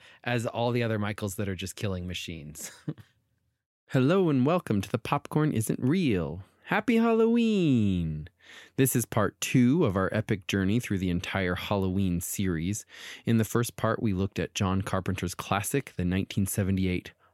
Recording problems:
none

